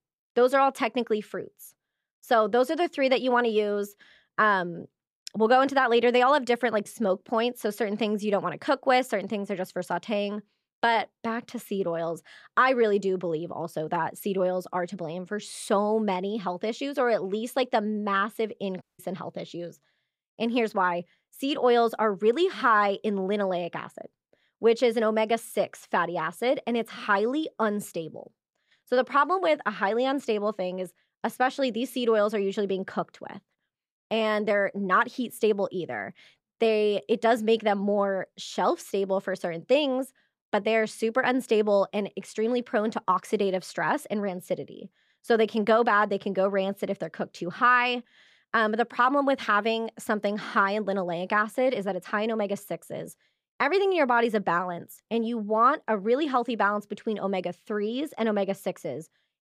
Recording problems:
audio cutting out; at 19 s

